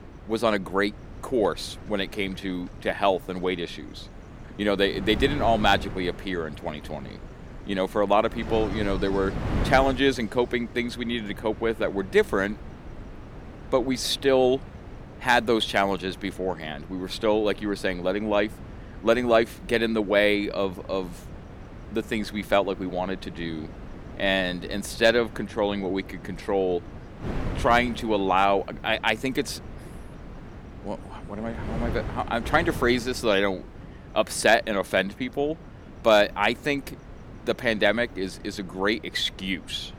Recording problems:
wind noise on the microphone; occasional gusts; 20 dB below the speech
traffic noise; faint; throughout; 30 dB below the speech

